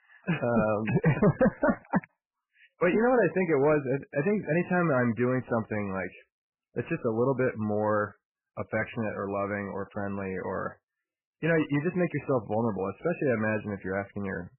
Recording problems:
distortion; heavy; 7 dB below the speech
garbled, watery; badly; nothing above 3 kHz

